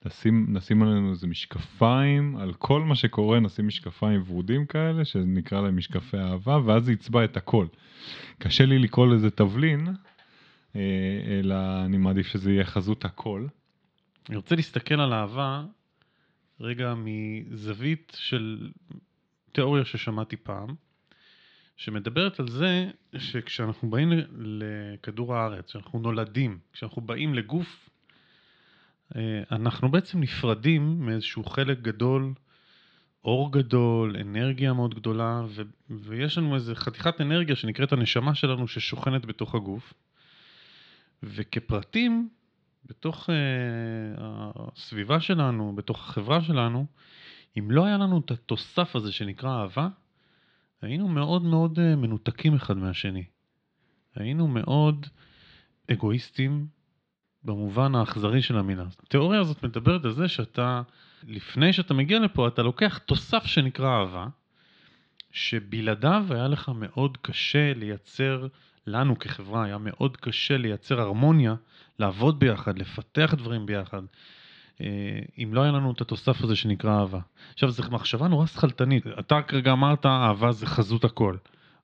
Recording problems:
muffled; slightly; fading above 4 kHz

